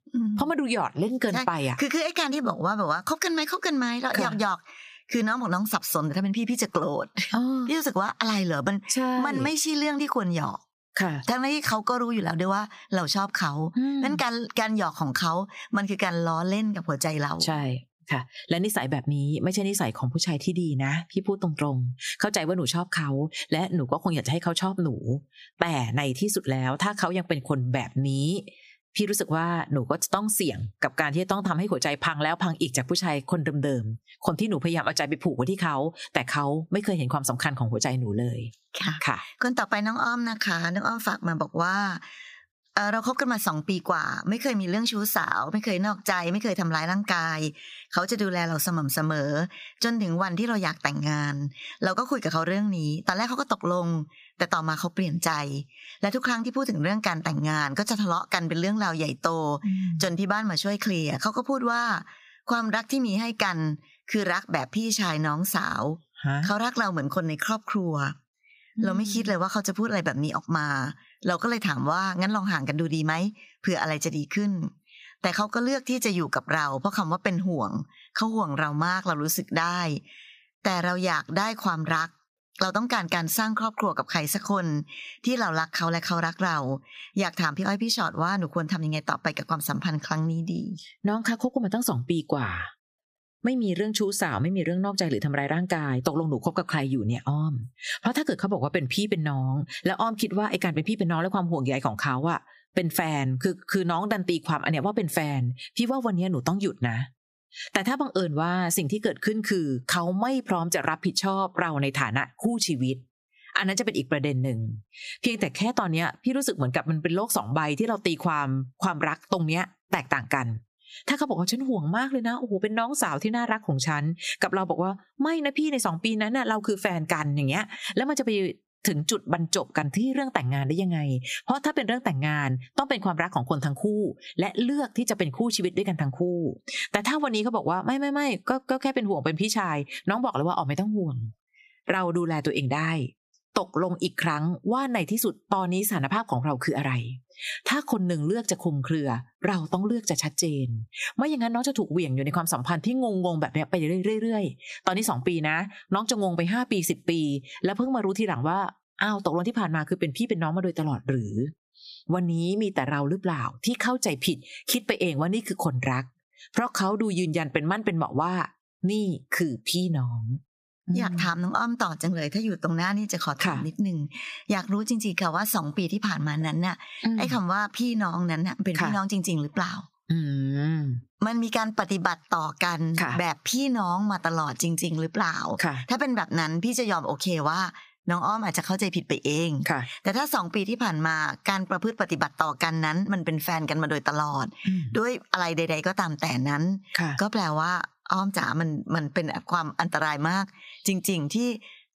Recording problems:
squashed, flat; somewhat

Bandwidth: 15 kHz